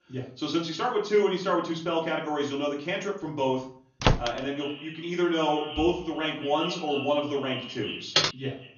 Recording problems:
echo of what is said; strong; from 4 s on; 180 ms later, 10 dB below the speech
off-mic speech; far
room echo; slight; dies away in 0.4 s
garbled, watery; slightly; nothing above 6.5 kHz
door banging; loud; at 4 s; peak 3 dB above the speech
keyboard typing; loud; at 8 s; peak 5 dB above the speech

